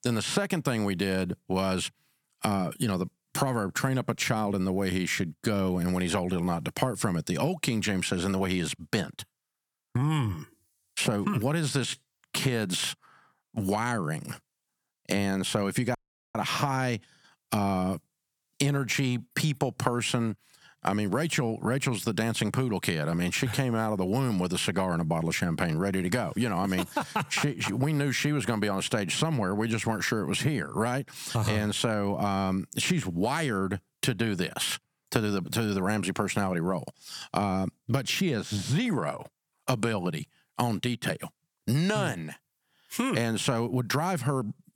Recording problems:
squashed, flat; somewhat
audio cutting out; at 16 s

